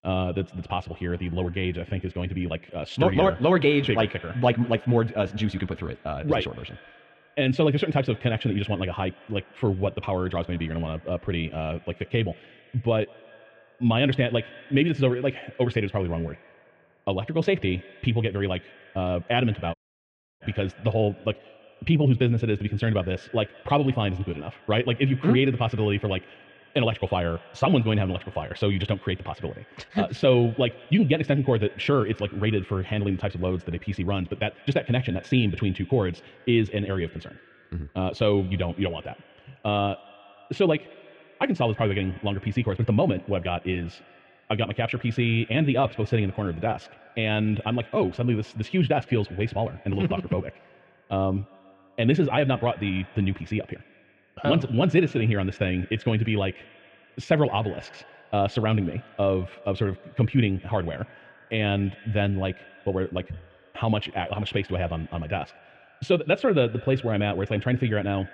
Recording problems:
muffled; very; fading above 3 kHz
wrong speed, natural pitch; too fast; 1.6 times normal speed
echo of what is said; faint; throughout; 160 ms later, 25 dB below the speech
audio cutting out; at 20 s for 0.5 s

